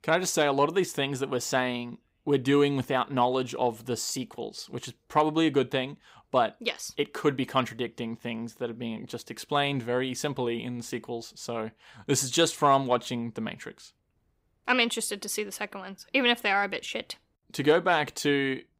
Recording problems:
none

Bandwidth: 15.5 kHz